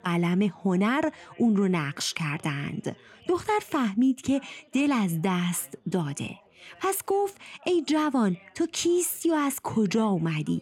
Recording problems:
background chatter; faint; throughout; 3 voices, 30 dB below the speech

